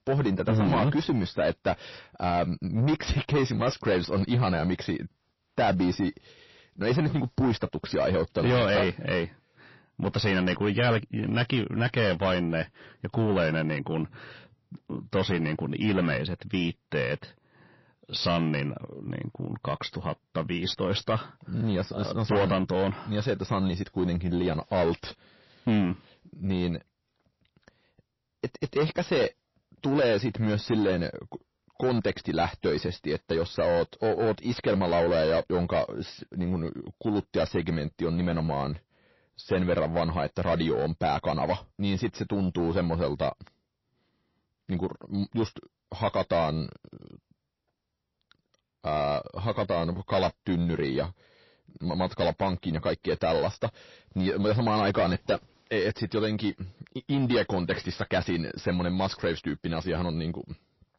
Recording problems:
distortion; heavy; 7 dB below the speech
garbled, watery; slightly; nothing above 5.5 kHz

